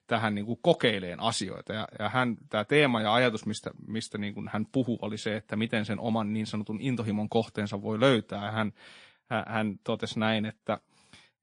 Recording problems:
garbled, watery; slightly; nothing above 9 kHz

